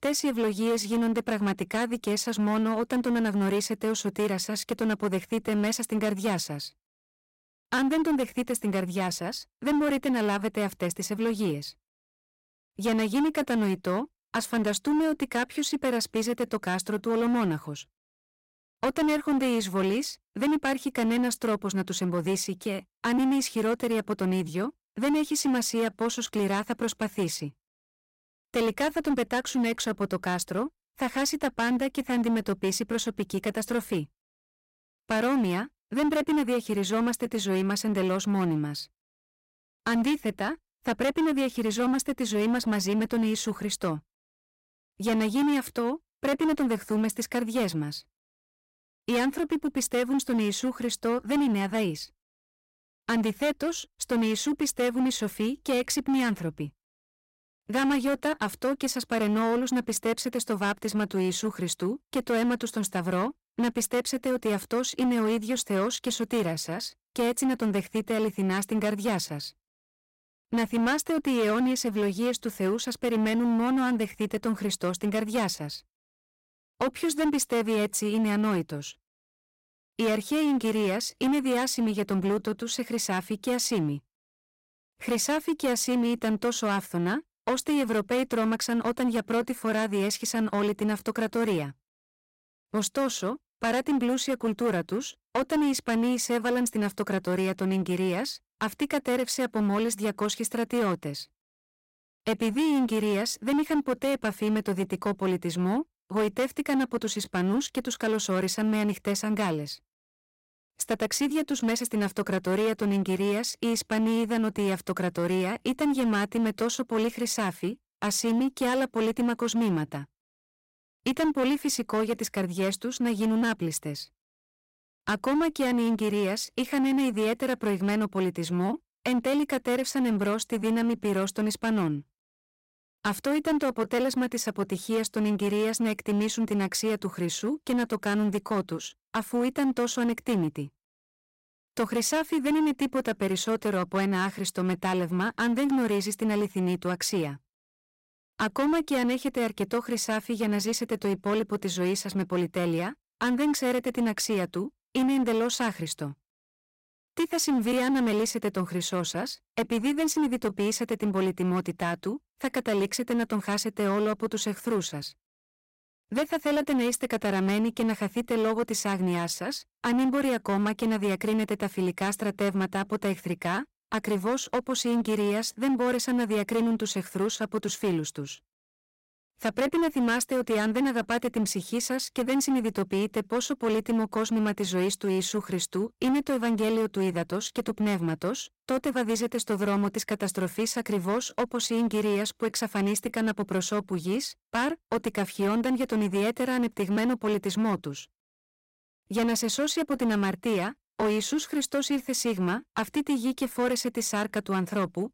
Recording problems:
distortion; slight; 13% of the sound clipped

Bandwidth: 16 kHz